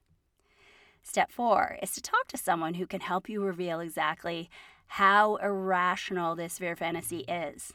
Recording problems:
none

